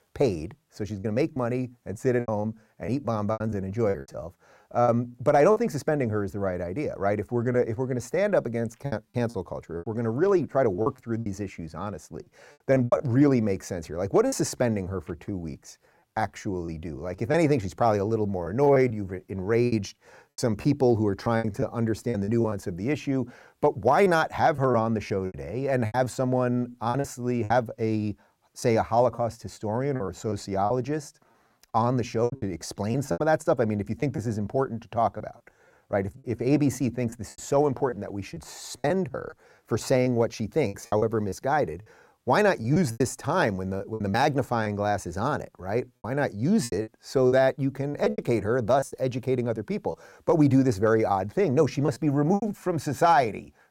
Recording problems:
choppy; very; 8% of the speech affected

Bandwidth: 16 kHz